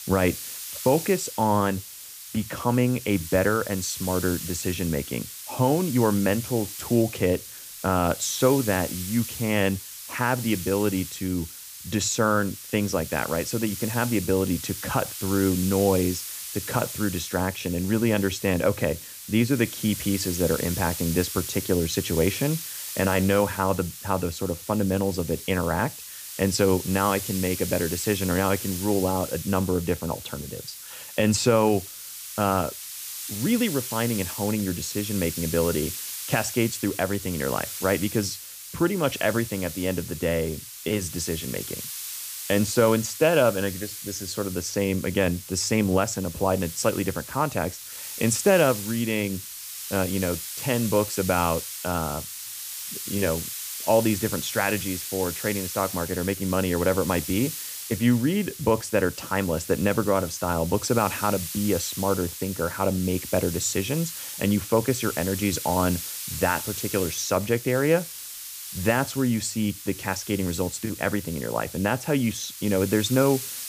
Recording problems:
hiss; loud; throughout; 8 dB below the speech

